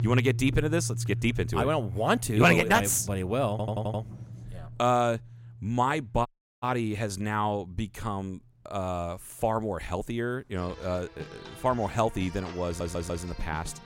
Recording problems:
background music; noticeable; throughout; 10 dB below the speech
rain or running water; faint; throughout; 25 dB below the speech
audio stuttering; at 3.5 s and at 13 s
audio cutting out; at 6.5 s

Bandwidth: 16 kHz